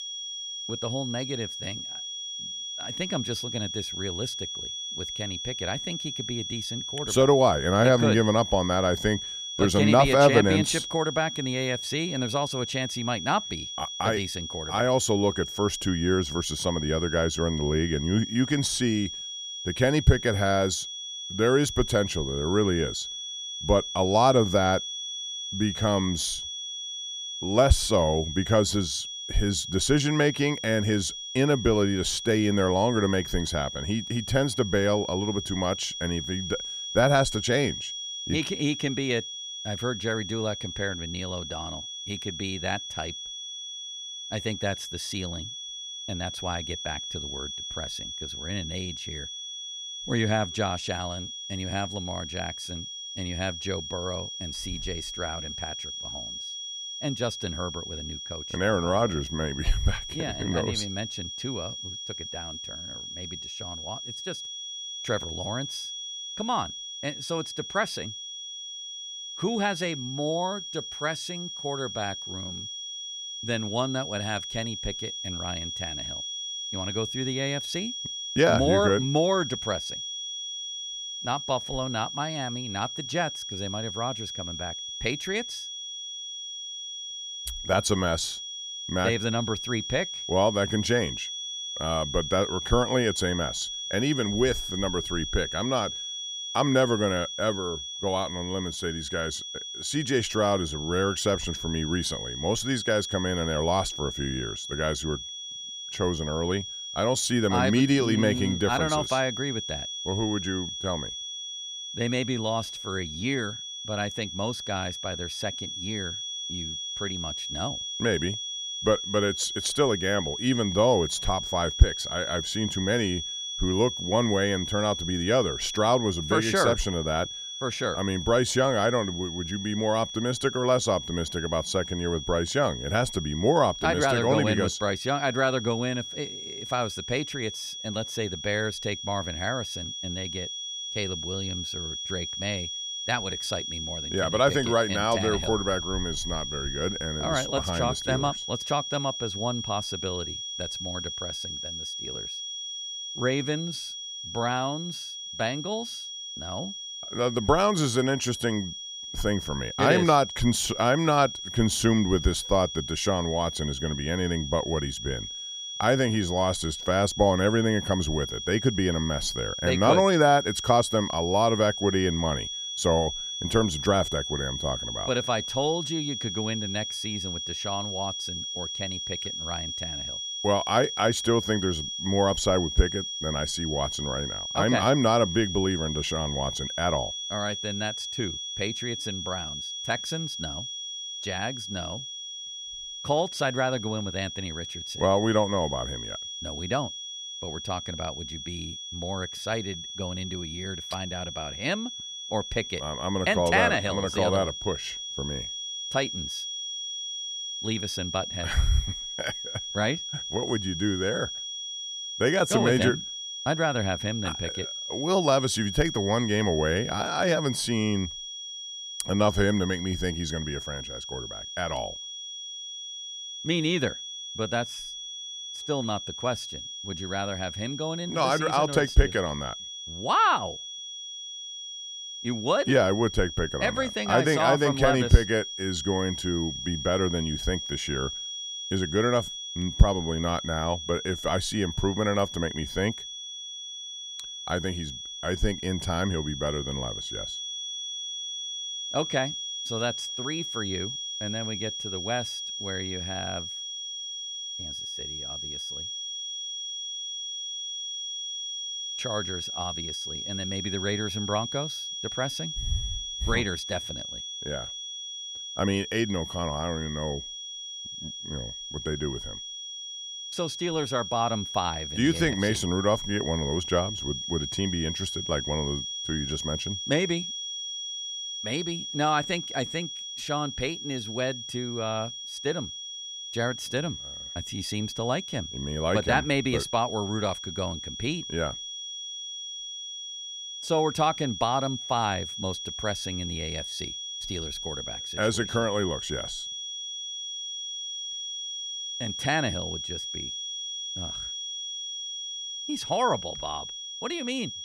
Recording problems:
high-pitched whine; loud; throughout; 3.5 kHz, 6 dB below the speech

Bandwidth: 15 kHz